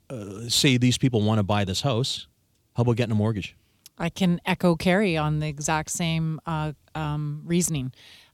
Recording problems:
none

